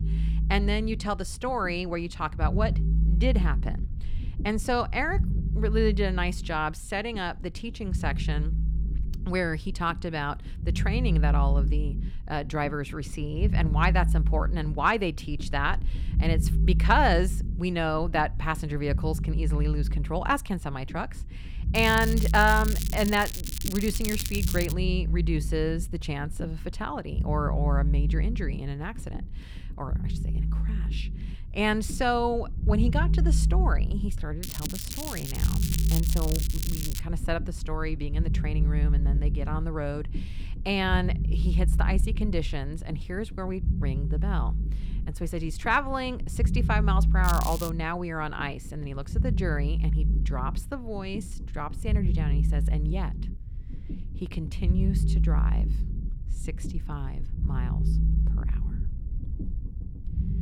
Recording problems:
crackling; loud; from 22 to 25 s, from 34 to 37 s and at 47 s; 5 dB below the speech
low rumble; noticeable; throughout; 15 dB below the speech

